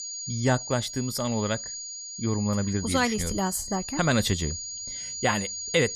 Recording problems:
high-pitched whine; loud; throughout; 7 kHz, 6 dB below the speech

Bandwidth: 14.5 kHz